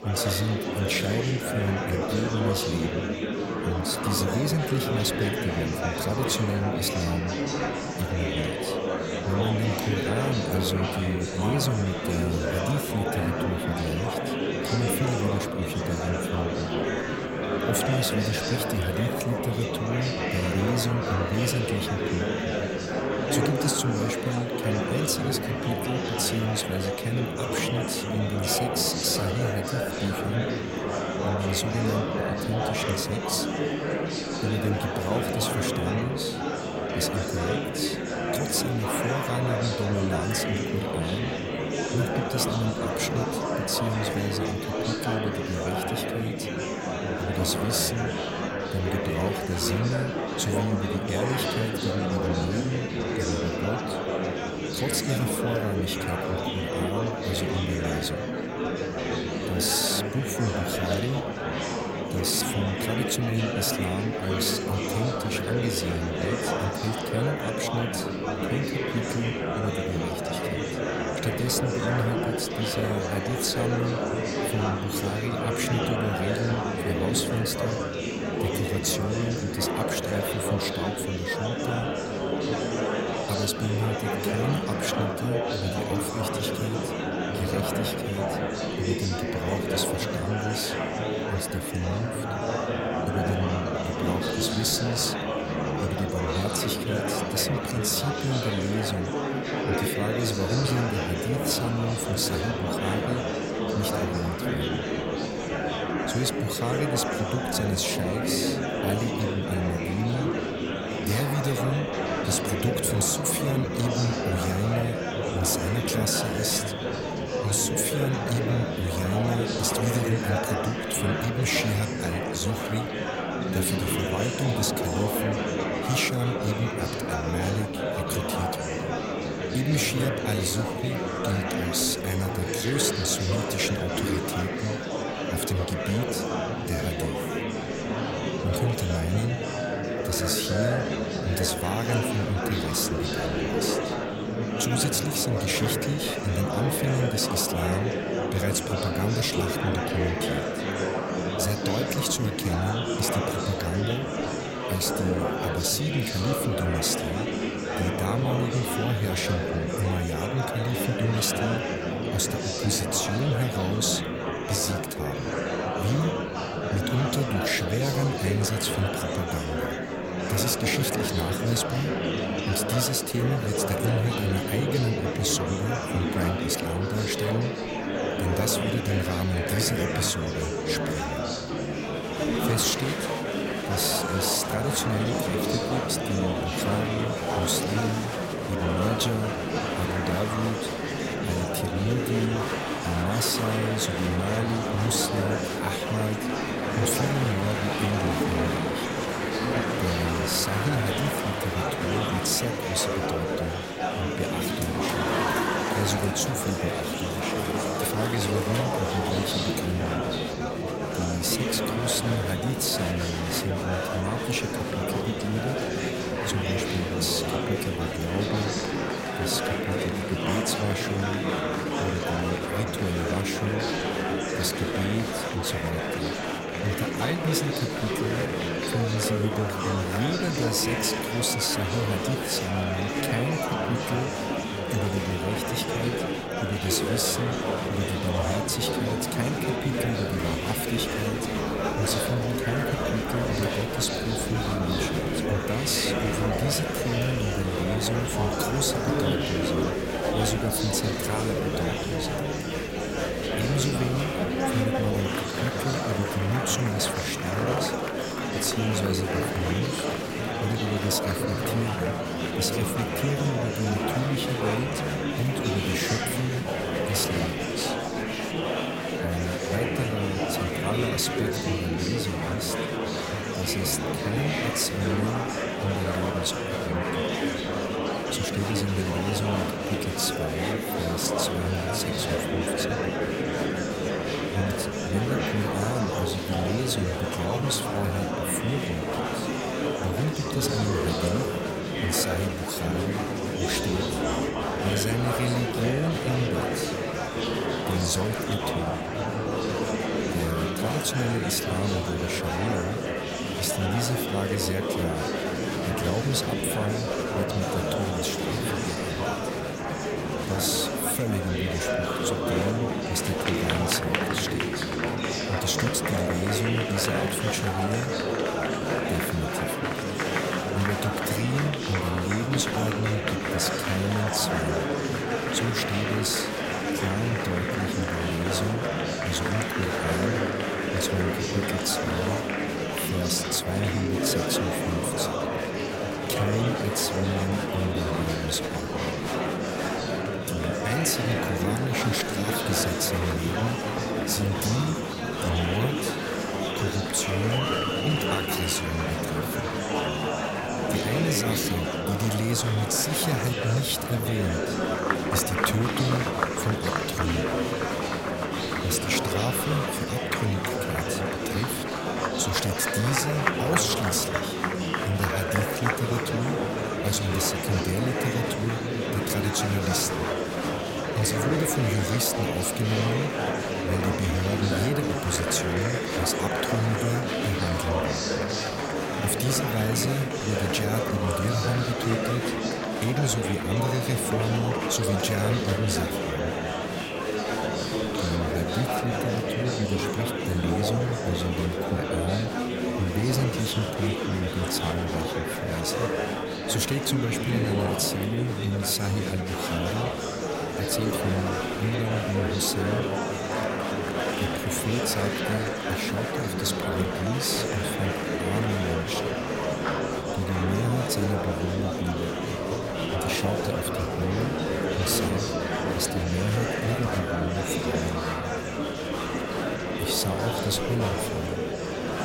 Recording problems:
murmuring crowd; very loud; throughout; 1 dB above the speech

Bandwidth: 16 kHz